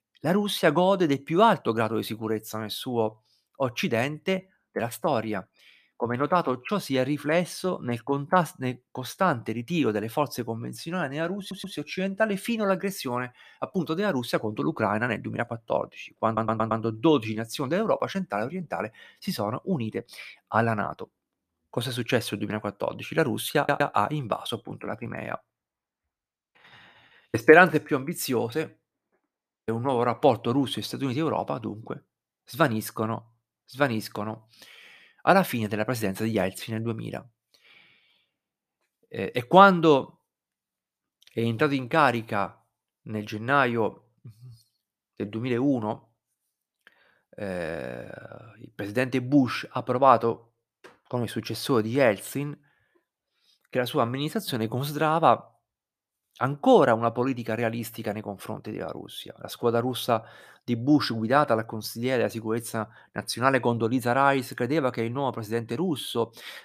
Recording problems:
audio stuttering; at 11 s, at 16 s and at 24 s

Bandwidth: 14.5 kHz